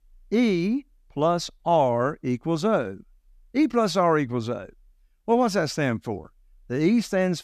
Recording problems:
none

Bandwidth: 14.5 kHz